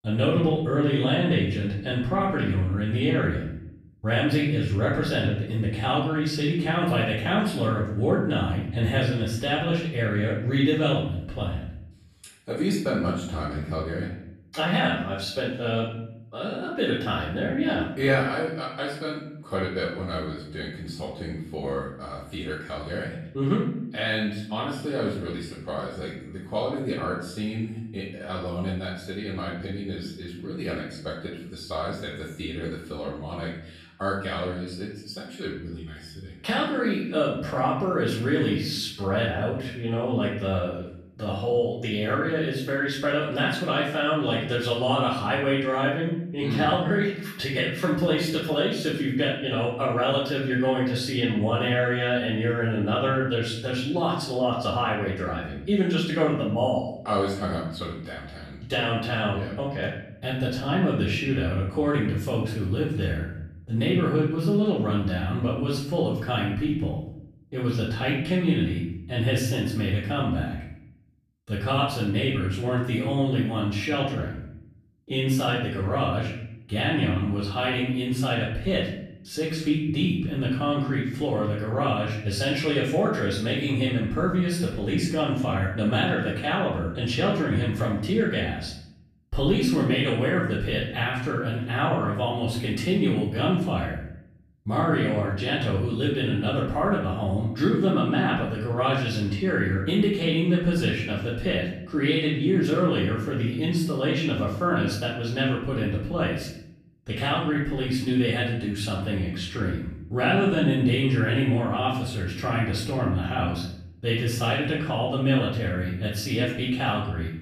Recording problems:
off-mic speech; far
room echo; noticeable; dies away in 0.7 s

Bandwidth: 14 kHz